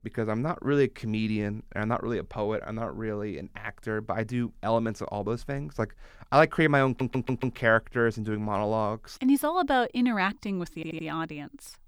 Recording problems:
audio stuttering; at 7 s and at 11 s

